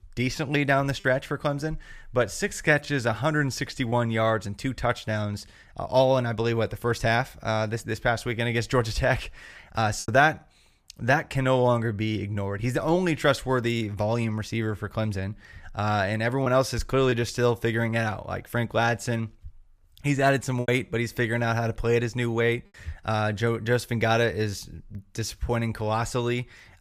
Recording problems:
choppy; occasionally; 1% of the speech affected

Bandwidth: 15 kHz